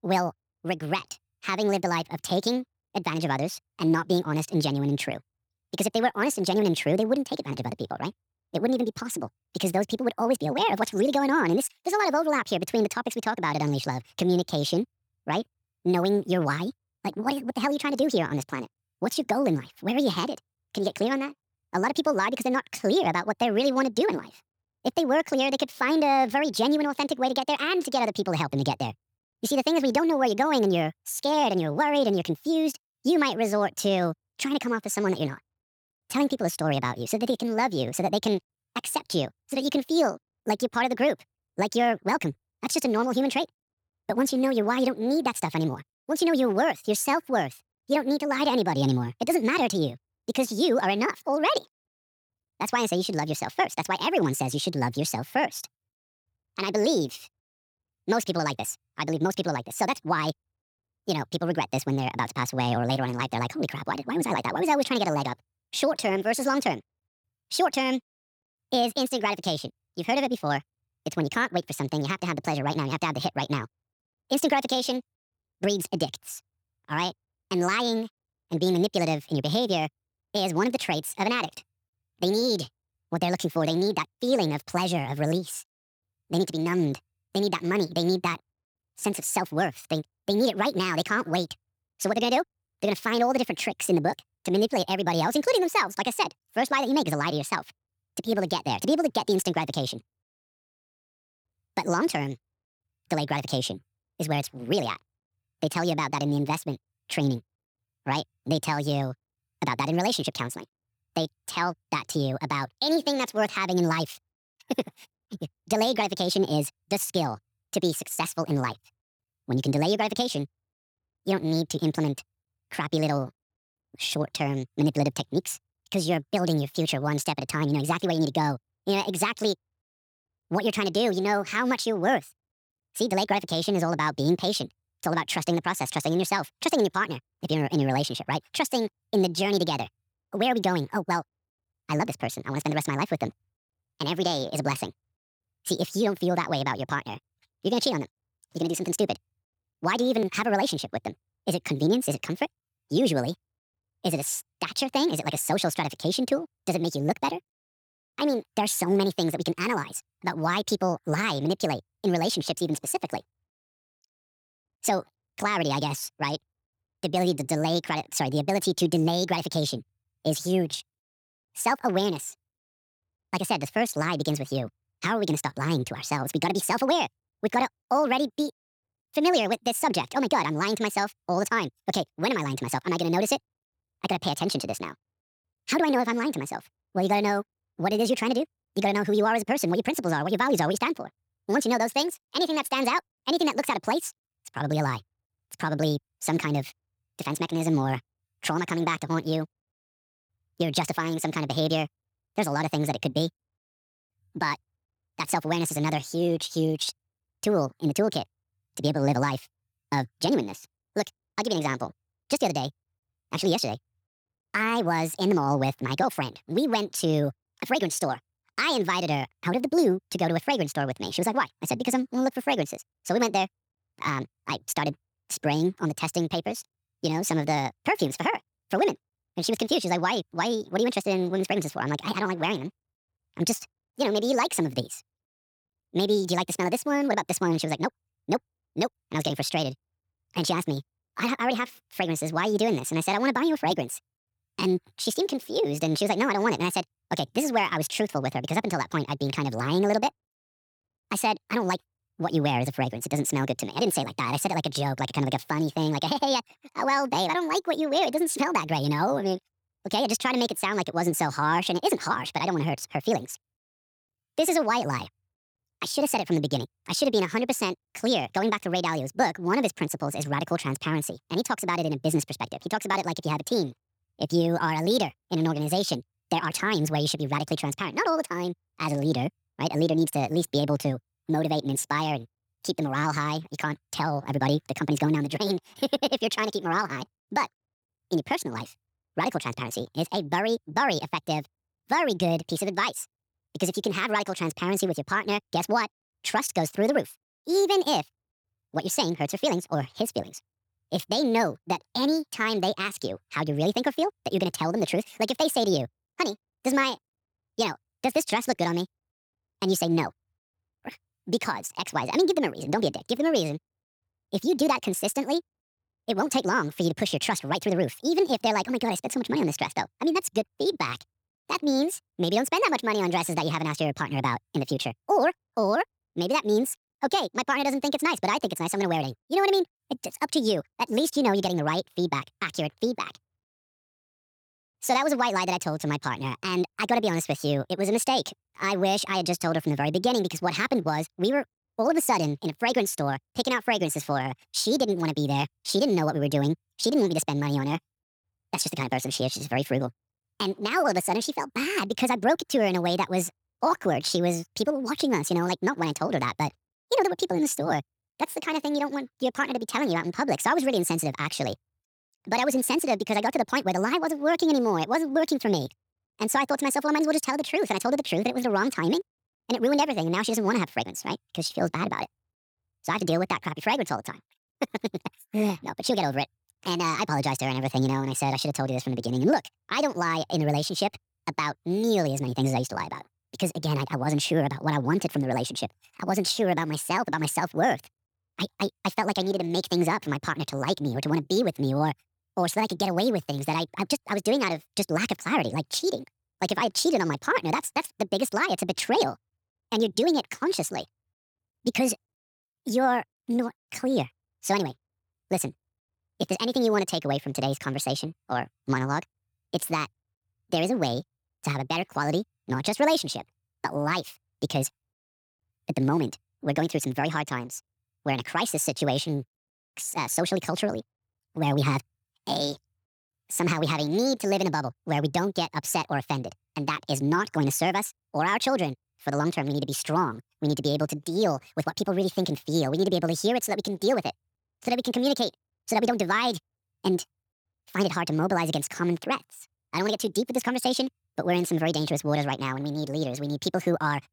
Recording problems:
wrong speed and pitch; too fast and too high; 1.6 times normal speed

